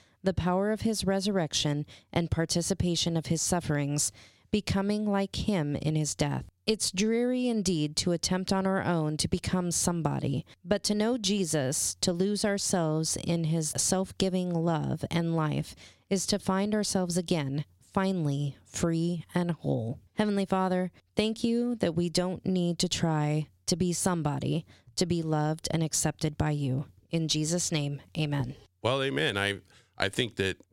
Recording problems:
squashed, flat; somewhat

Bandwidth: 16.5 kHz